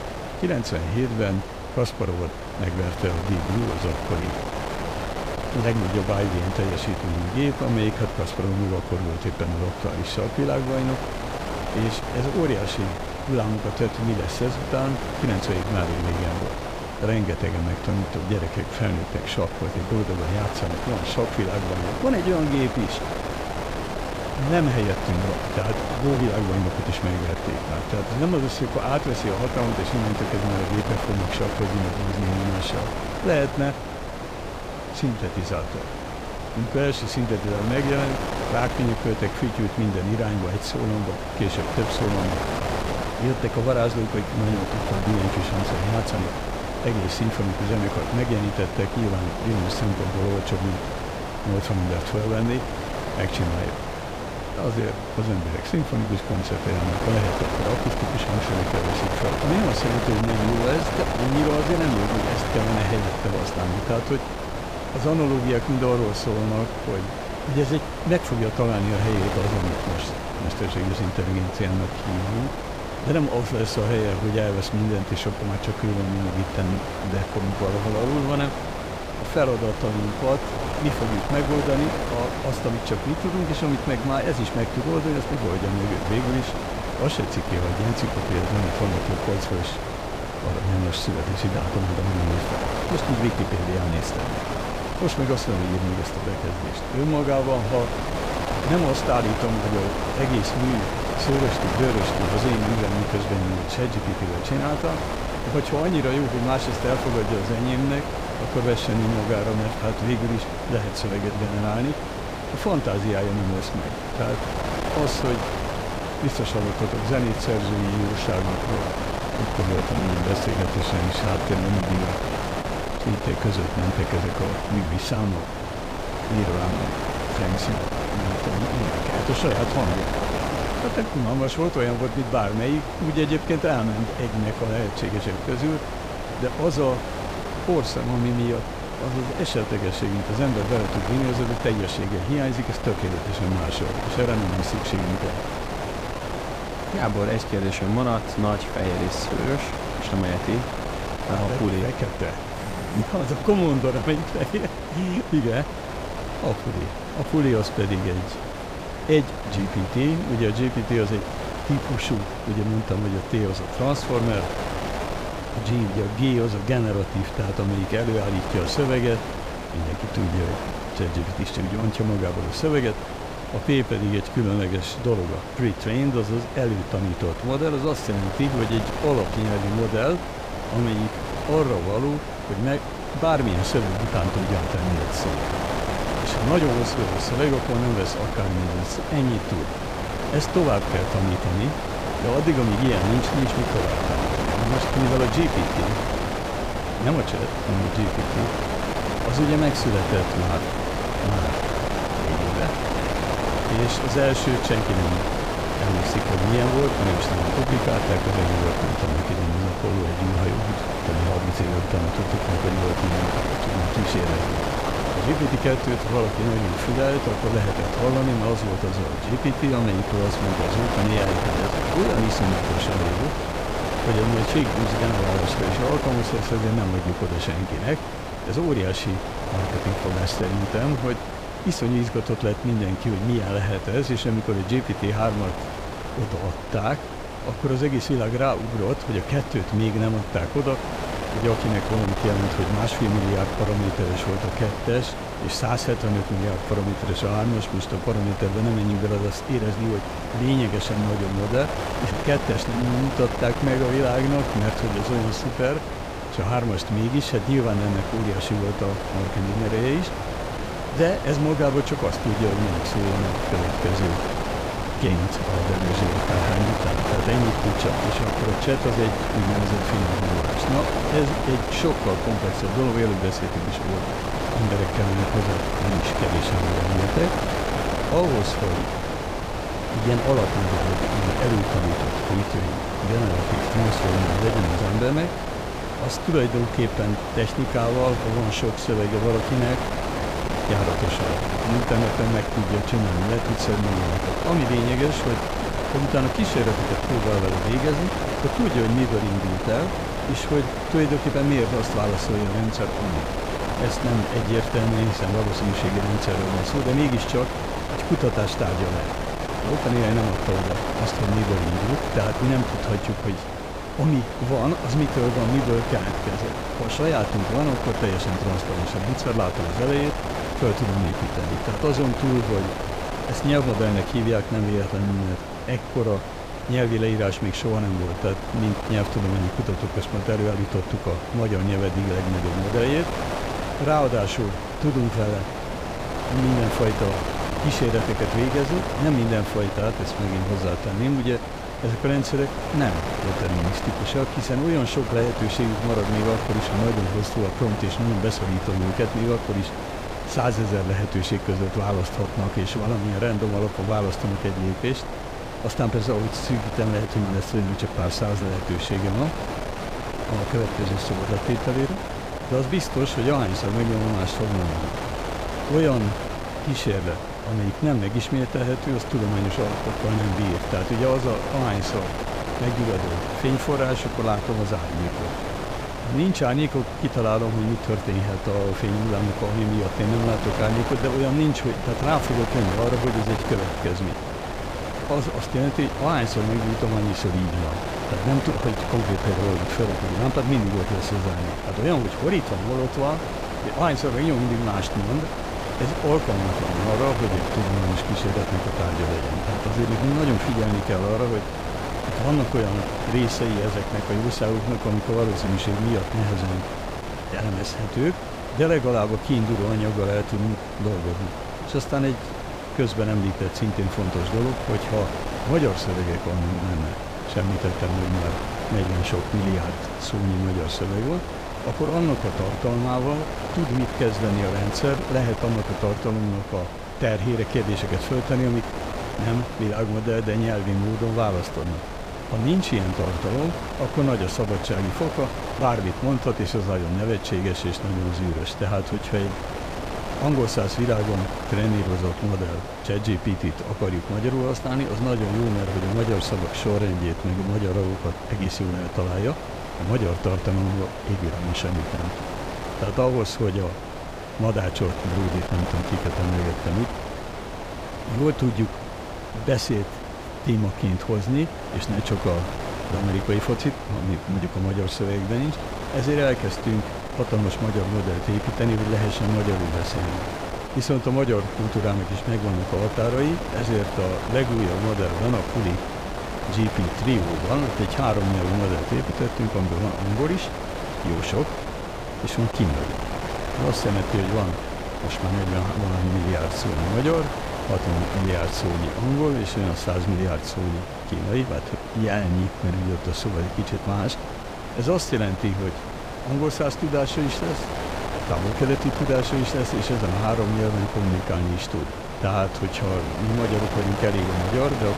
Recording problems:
wind noise on the microphone; heavy; as loud as the speech

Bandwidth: 15.5 kHz